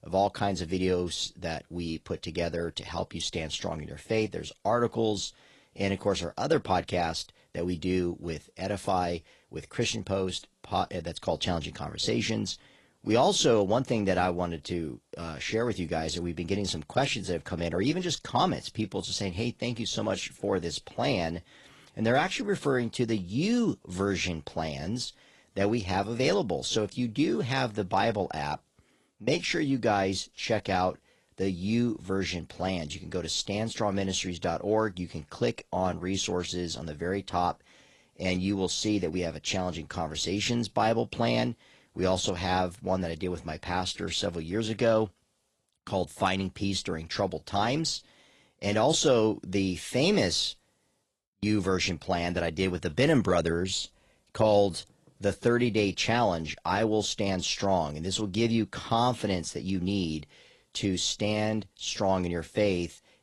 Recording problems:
garbled, watery; slightly

